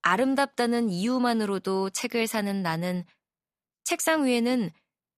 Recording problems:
none

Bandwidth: 14.5 kHz